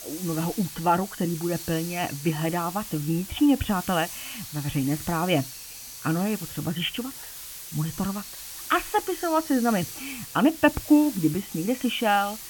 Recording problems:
high frequencies cut off; severe; nothing above 3.5 kHz
hiss; noticeable; throughout; 10 dB below the speech

